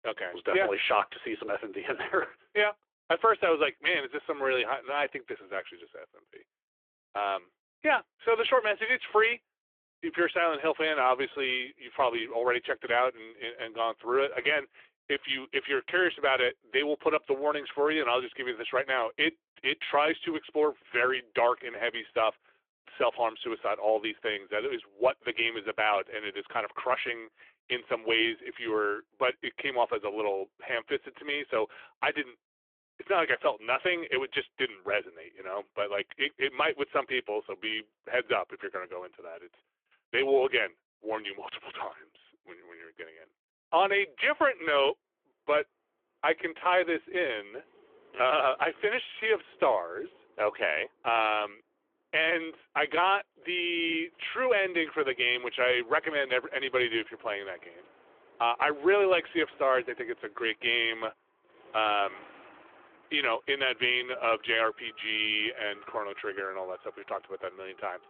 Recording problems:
phone-call audio; nothing above 3.5 kHz
traffic noise; faint; from 45 s on; 30 dB below the speech

